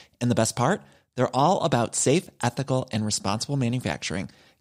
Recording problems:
none

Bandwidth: 15.5 kHz